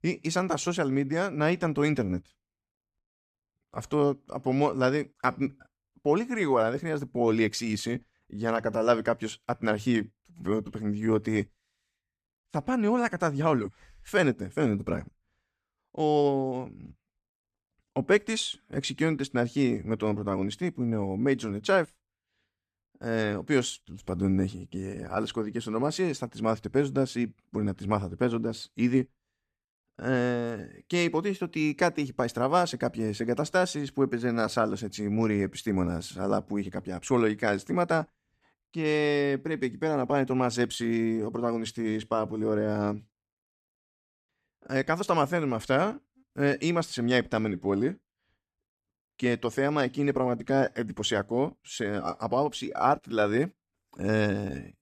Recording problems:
none

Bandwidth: 14.5 kHz